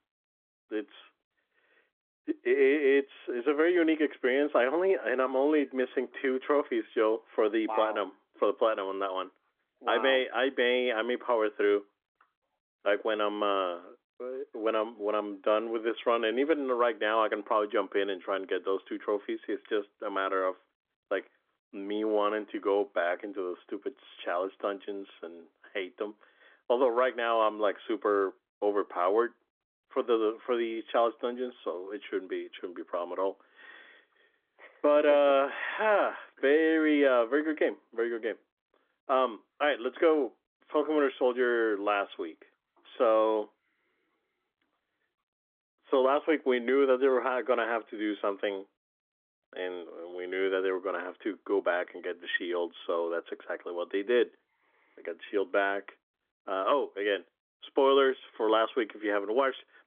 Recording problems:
phone-call audio; nothing above 3.5 kHz

